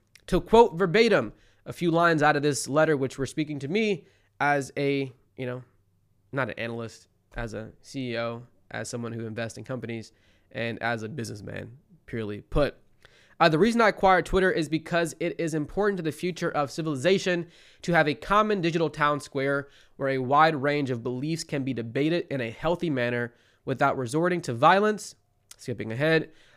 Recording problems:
none

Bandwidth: 15 kHz